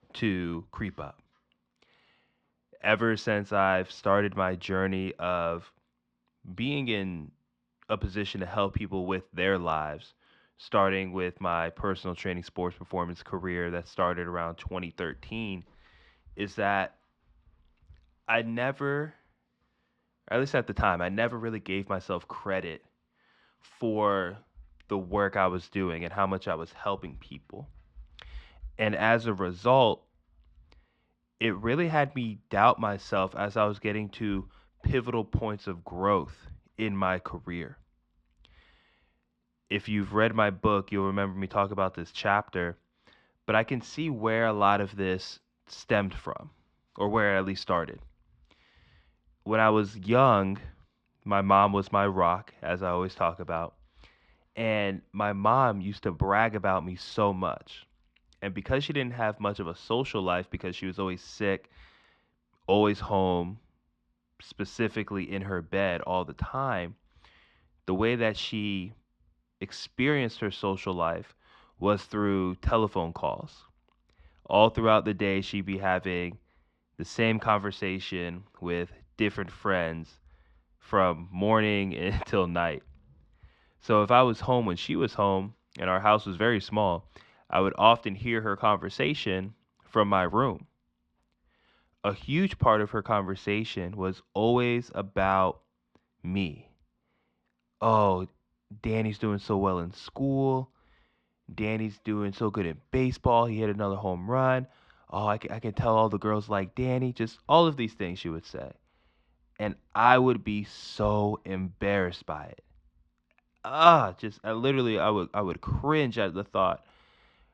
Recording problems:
muffled; slightly; fading above 4 kHz

